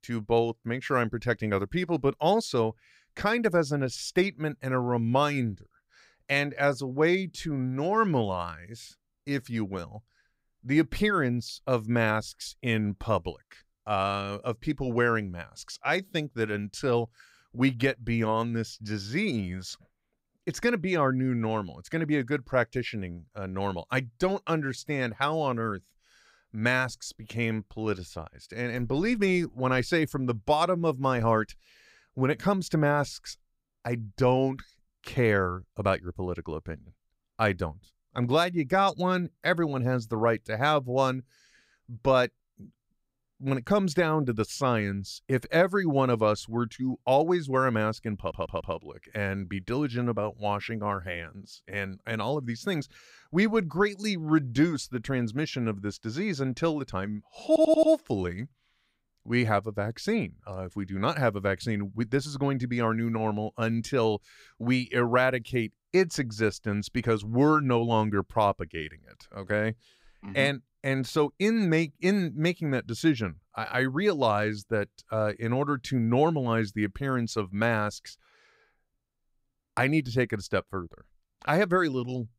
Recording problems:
audio stuttering; at 48 s and at 57 s

